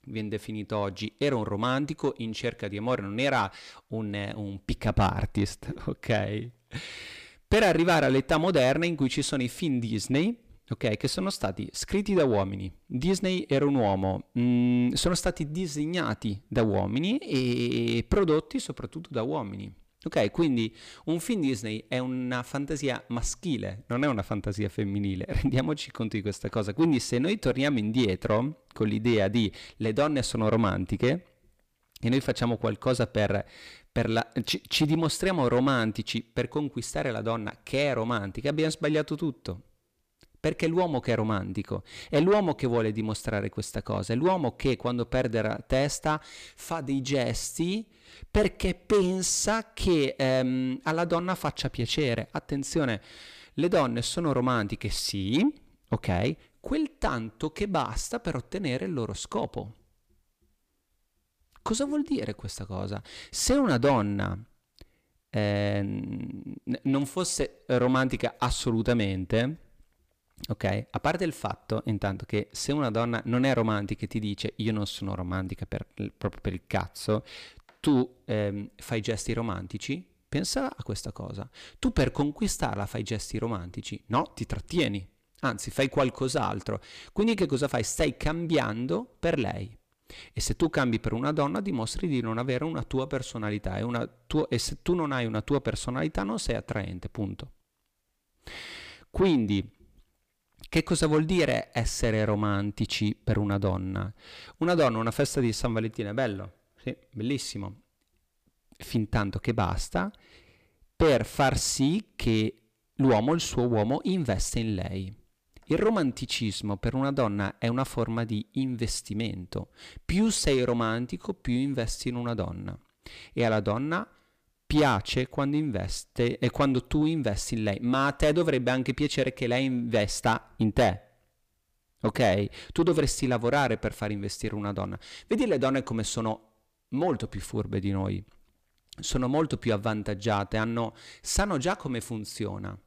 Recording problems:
distortion; slight; 10 dB below the speech

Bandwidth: 15 kHz